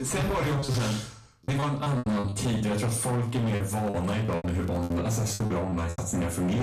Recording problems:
distortion; heavy; 27% of the sound clipped
off-mic speech; far
room echo; slight; dies away in 0.4 s
crackling; faint; from 3.5 to 5 s; 30 dB below the speech
choppy; very; 12% of the speech affected
abrupt cut into speech; at the start and the end

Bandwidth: 14.5 kHz